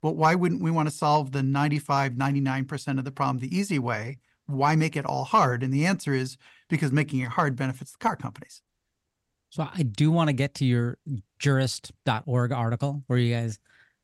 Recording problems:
none

